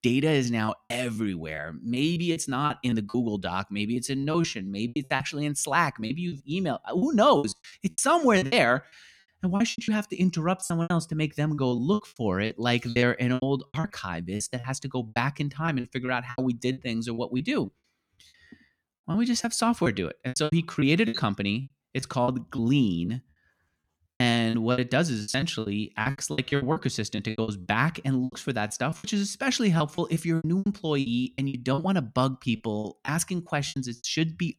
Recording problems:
choppy; very; 15% of the speech affected

